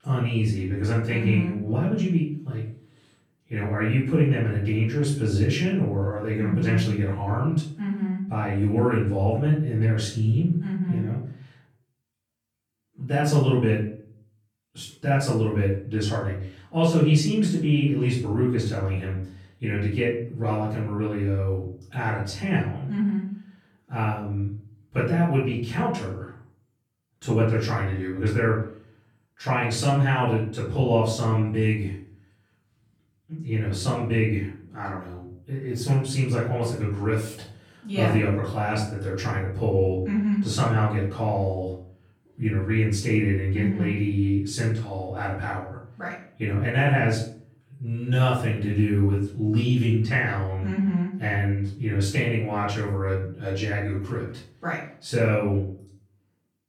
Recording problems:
off-mic speech; far
room echo; noticeable; dies away in 0.5 s

